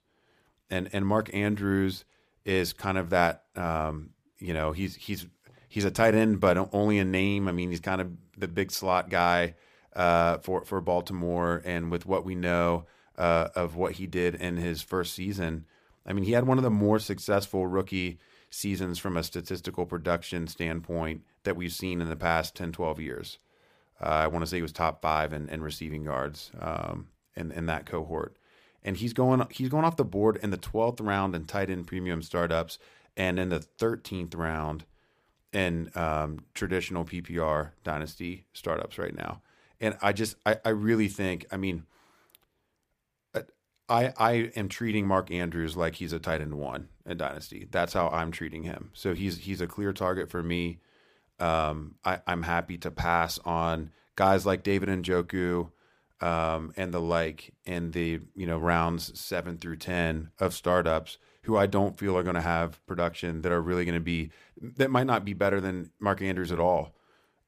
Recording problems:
none

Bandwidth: 15 kHz